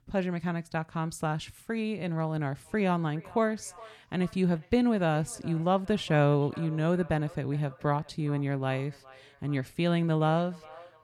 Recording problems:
echo of what is said; faint; from 2.5 s on; 410 ms later, 25 dB below the speech

